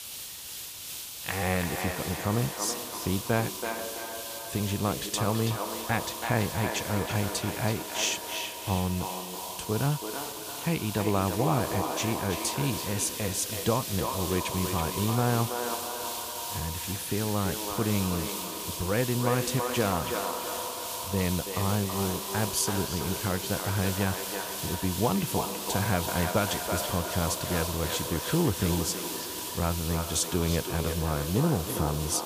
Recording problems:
echo of what is said; strong; throughout; 330 ms later, 6 dB below the speech
hiss; loud; throughout; 5 dB below the speech

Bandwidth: 15 kHz